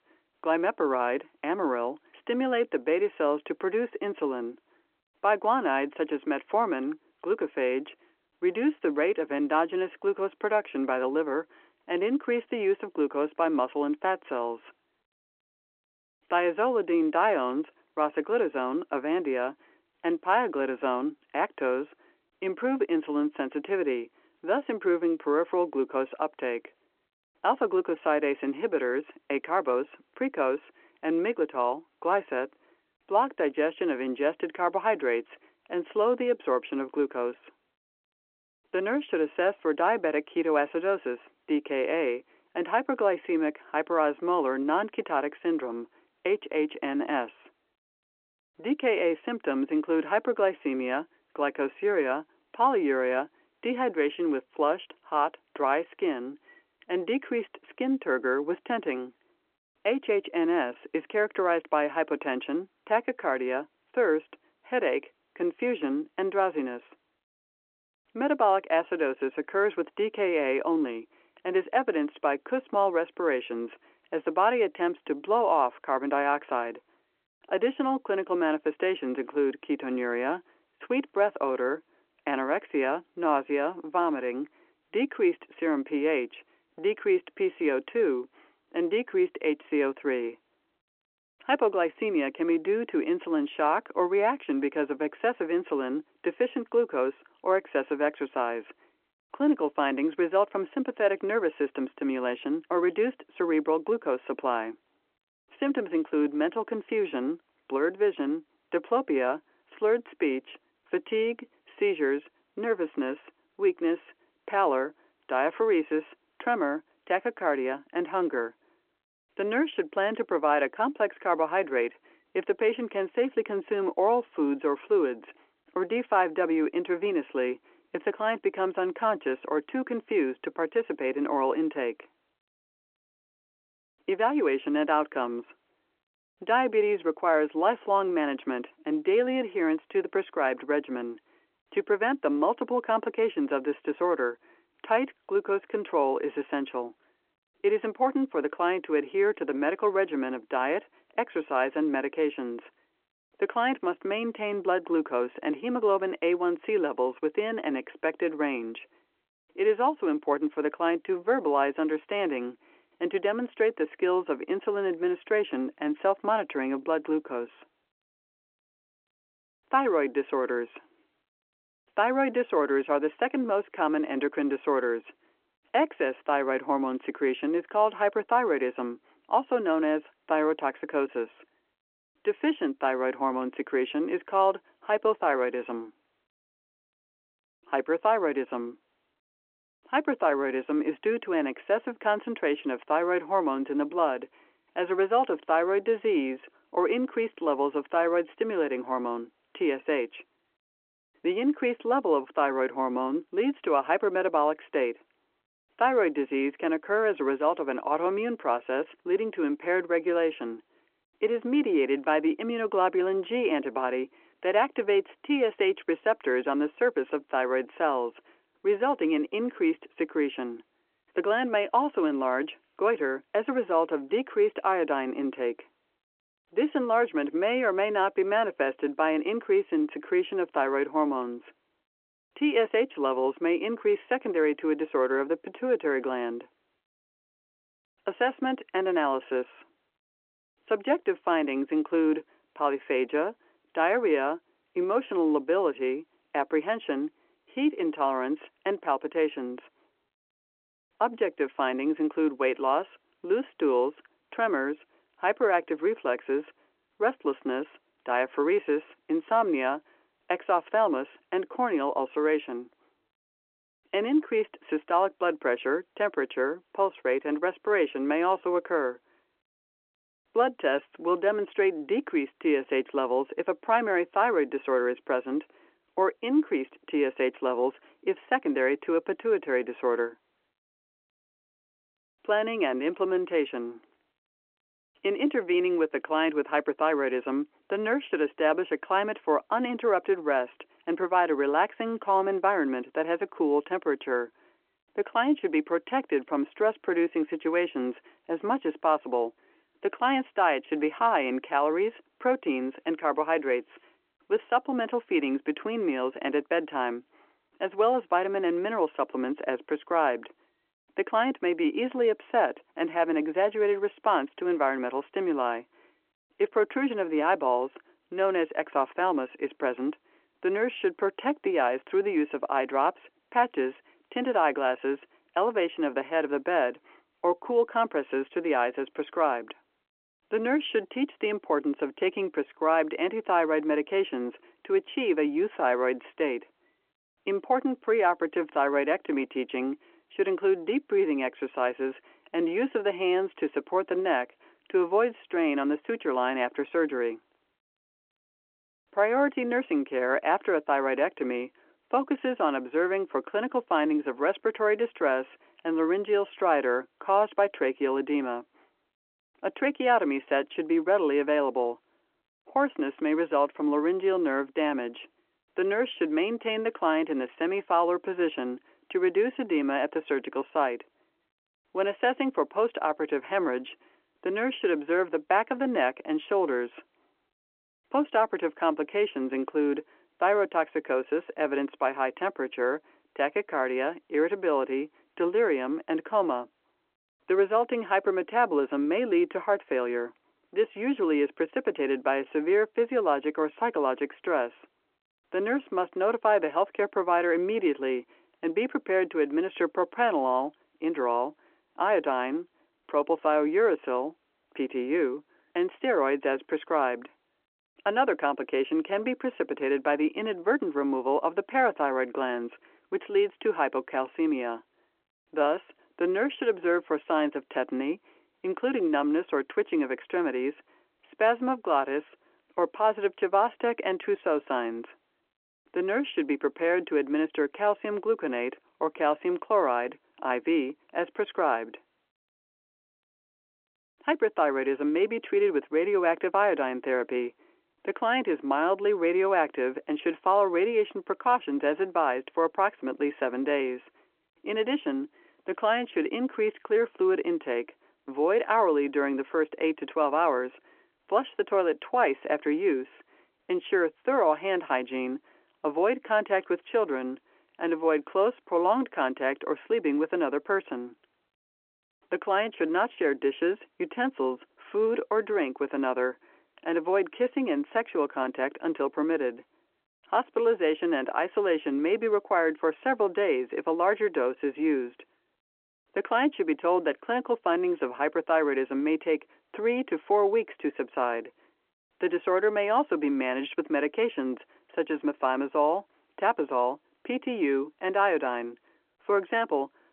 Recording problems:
phone-call audio

